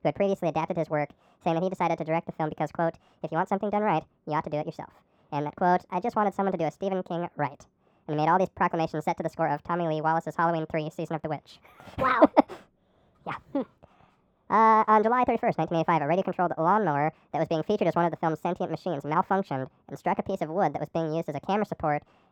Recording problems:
muffled; very; fading above 2.5 kHz
wrong speed and pitch; too fast and too high; 1.6 times normal speed

